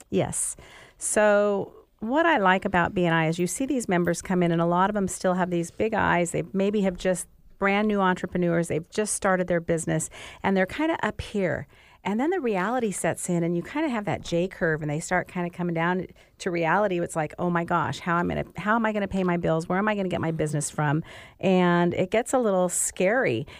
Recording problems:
none

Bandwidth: 15 kHz